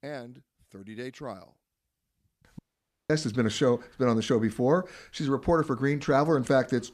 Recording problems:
audio cutting out; at 2.5 s for 0.5 s

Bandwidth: 14.5 kHz